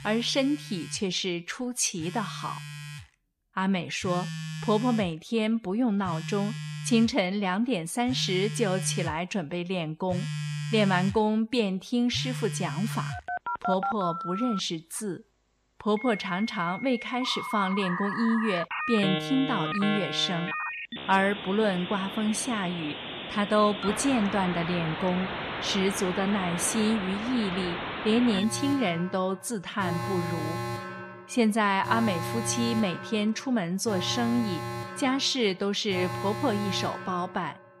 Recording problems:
alarms or sirens; loud; throughout; 6 dB below the speech

